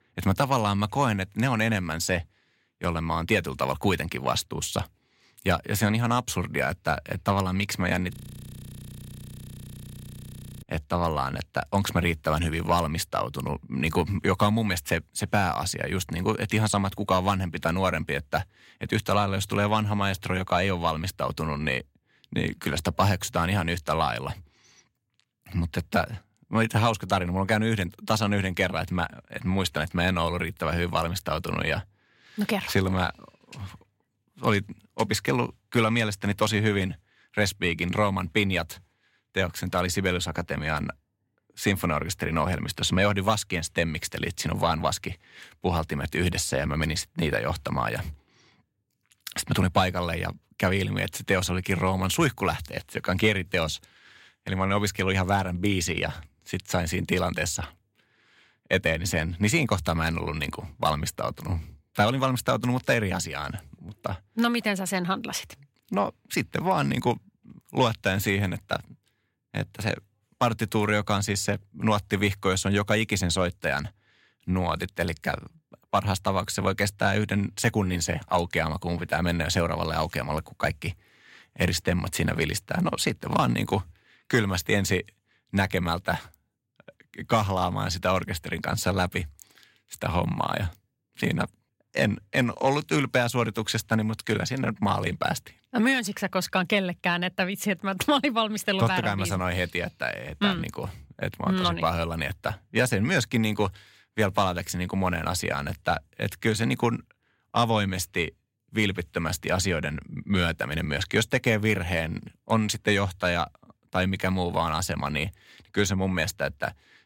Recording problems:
audio freezing; at 8 s for 2.5 s

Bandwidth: 16 kHz